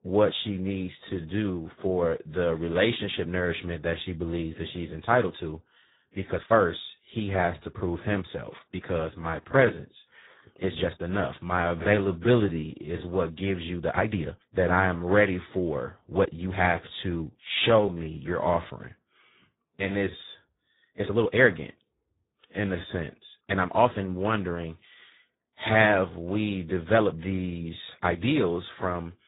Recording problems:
garbled, watery; badly
high frequencies cut off; severe; nothing above 4 kHz
uneven, jittery; strongly; from 1 to 28 s

